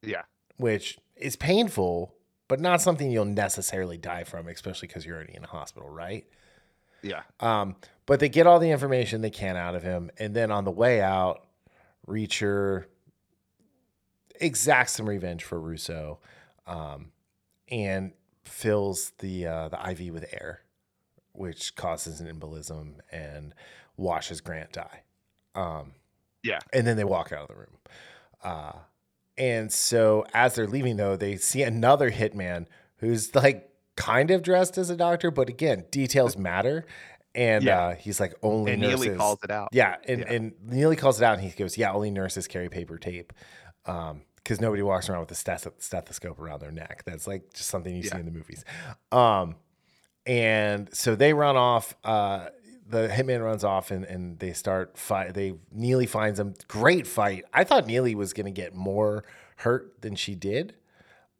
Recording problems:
none

